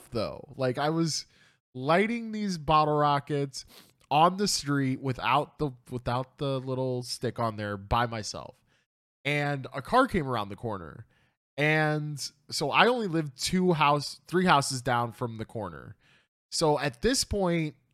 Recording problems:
none

